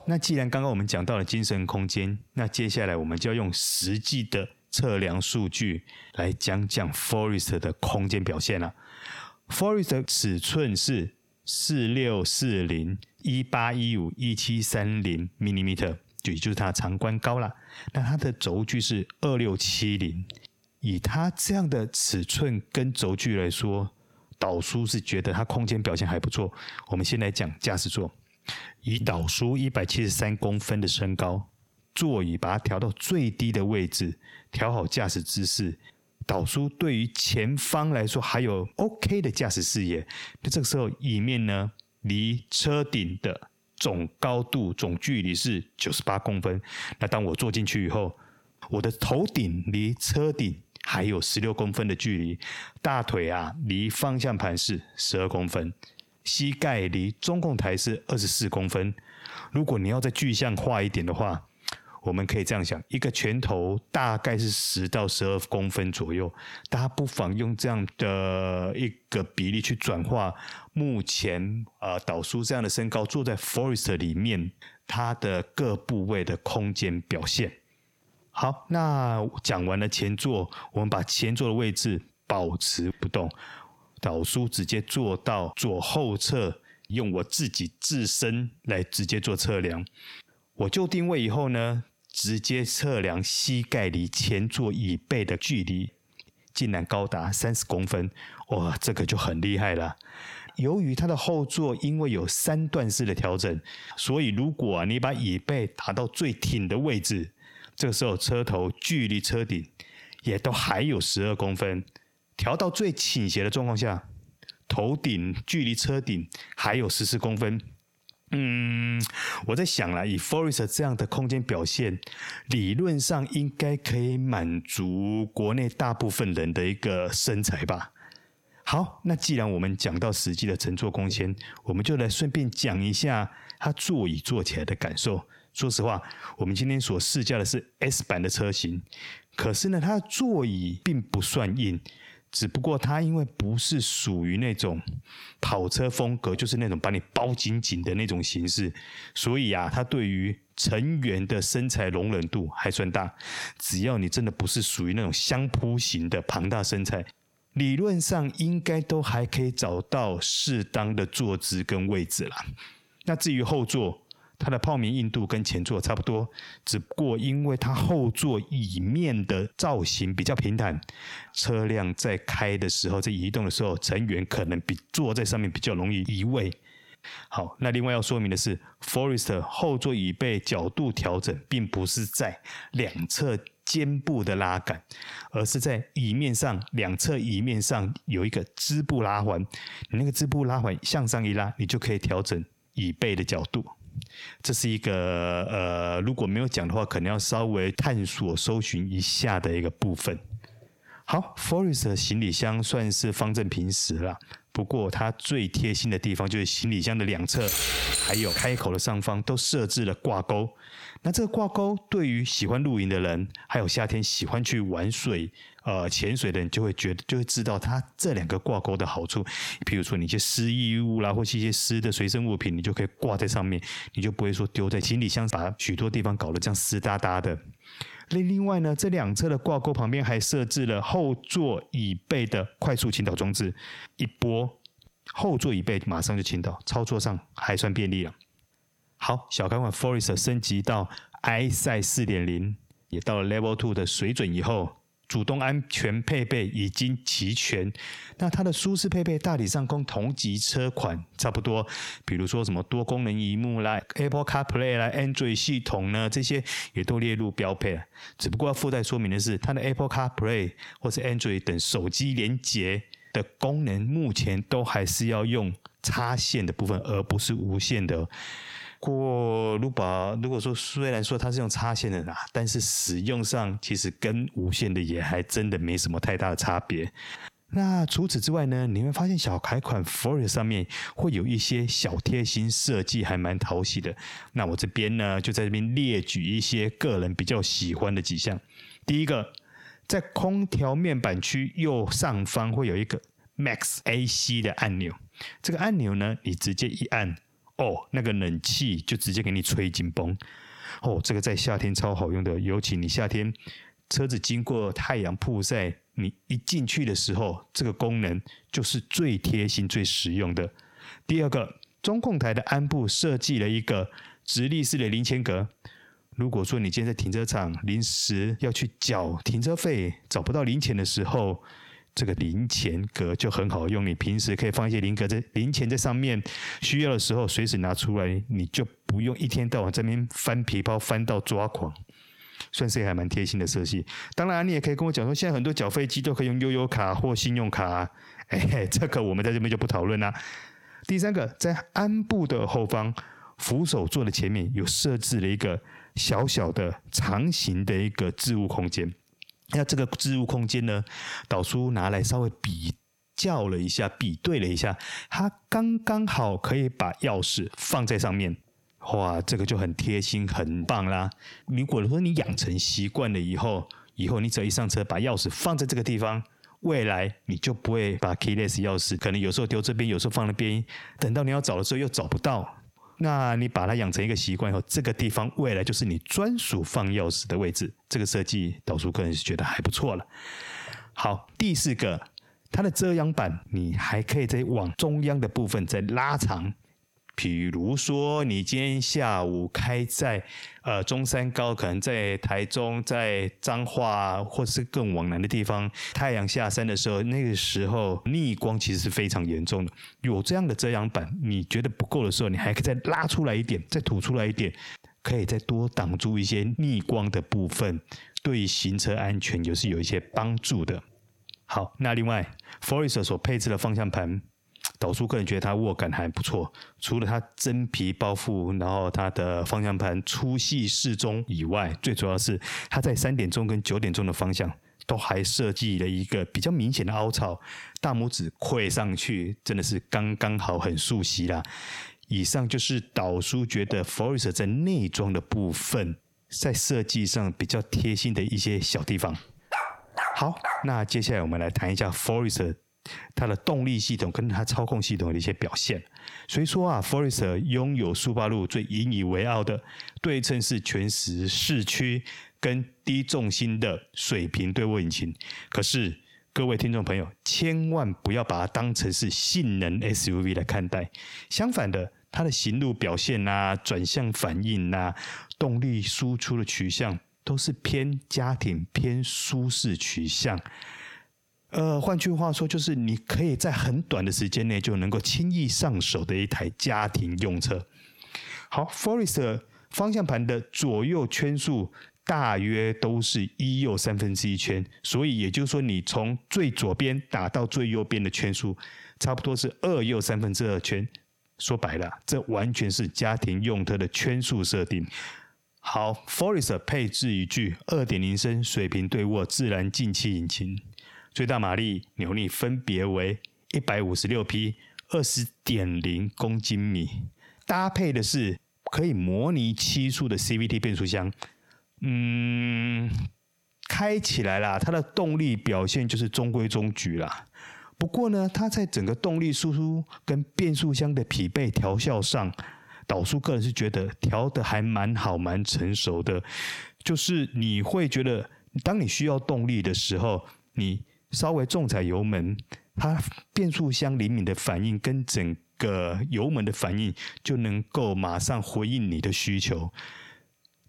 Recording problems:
squashed, flat; heavily
jangling keys; loud; from 3:27 to 3:29; peak 3 dB above the speech
dog barking; noticeable; from 7:20 to 7:21; peak 3 dB below the speech

